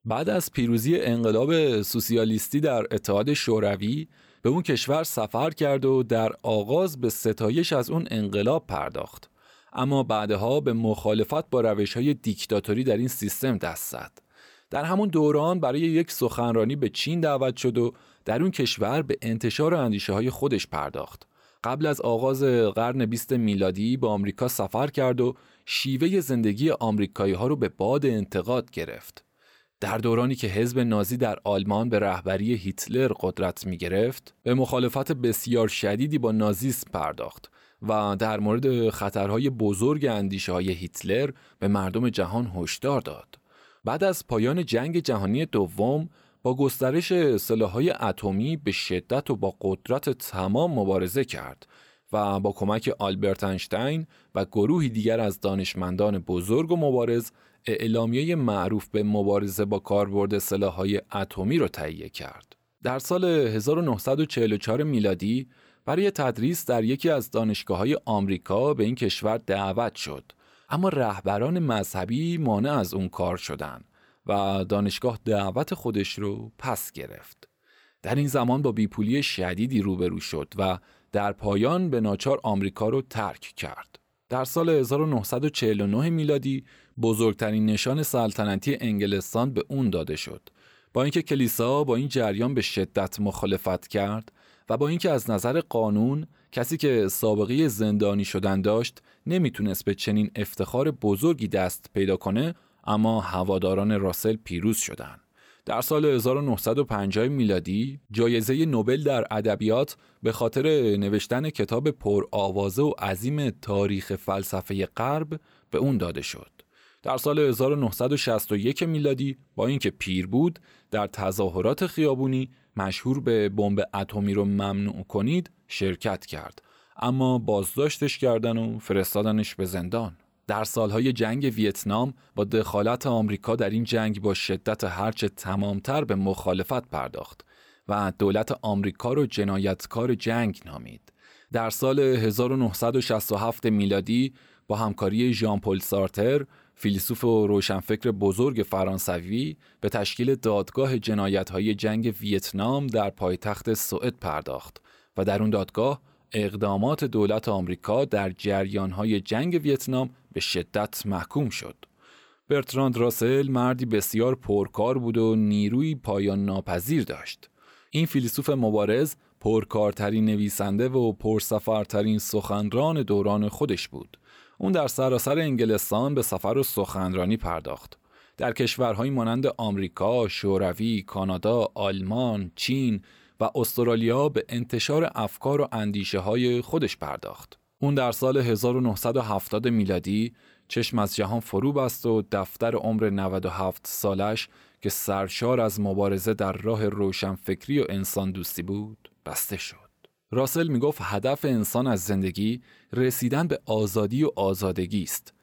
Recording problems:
none

